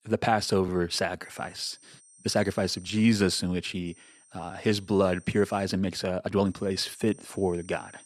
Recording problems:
high-pitched whine; faint; from 1 to 3 s, from 4 to 5.5 s and from 6.5 s on; 8.5 kHz, 25 dB below the speech
uneven, jittery; strongly; from 0.5 to 7.5 s

